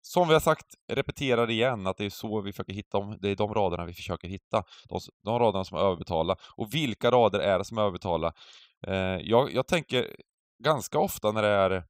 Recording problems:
none

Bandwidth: 15.5 kHz